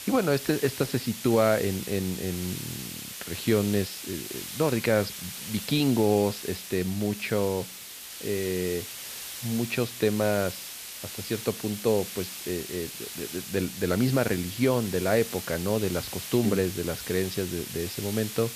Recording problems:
high frequencies cut off; noticeable; nothing above 5.5 kHz
hiss; loud; throughout; 8 dB below the speech

